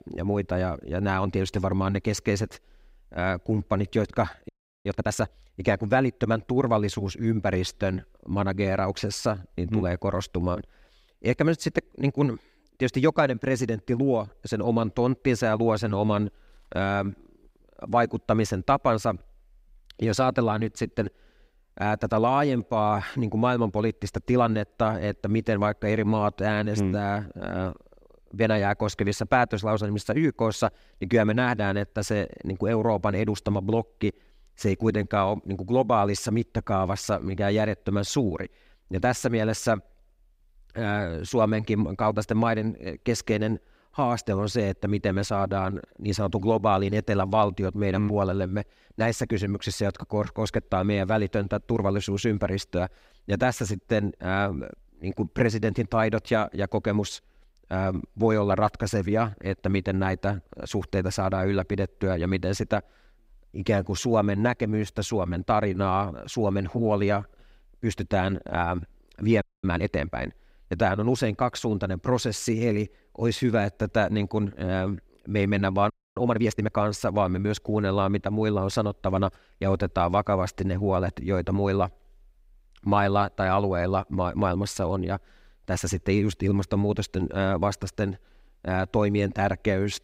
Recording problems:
audio freezing; at 4.5 s, at 1:09 and at 1:16

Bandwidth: 15.5 kHz